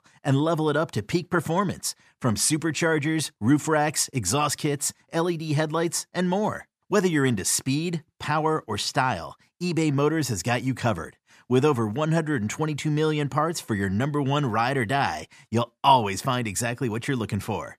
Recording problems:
none

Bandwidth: 14.5 kHz